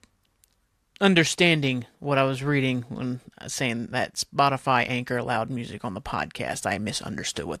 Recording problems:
none

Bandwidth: 14 kHz